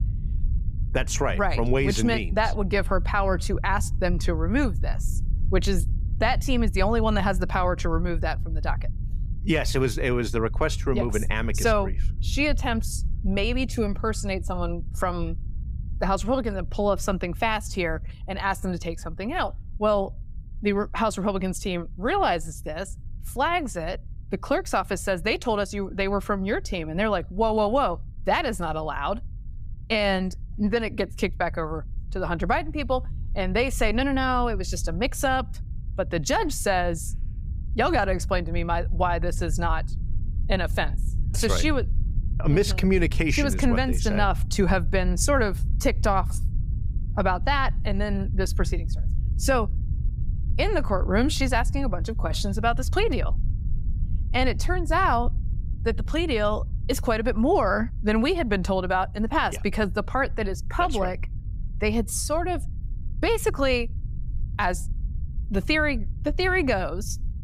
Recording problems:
low rumble; faint; throughout; 25 dB below the speech

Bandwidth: 15.5 kHz